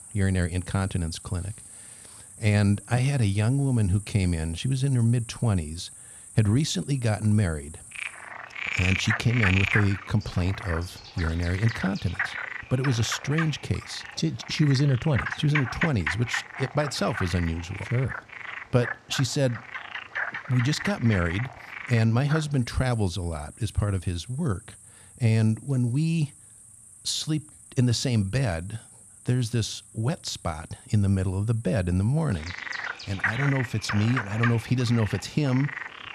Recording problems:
animal sounds; loud; throughout; 7 dB below the speech

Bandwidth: 14 kHz